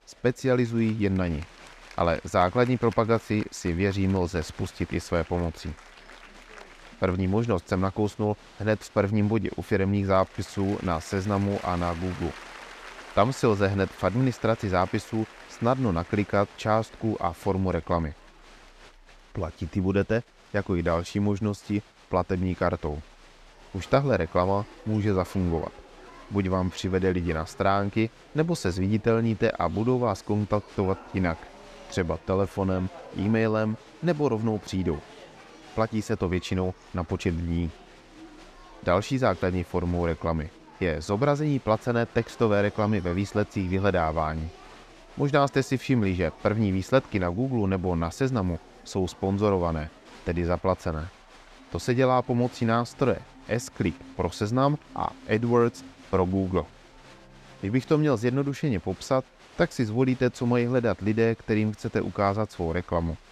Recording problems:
crowd noise; faint; throughout; 20 dB below the speech

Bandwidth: 14.5 kHz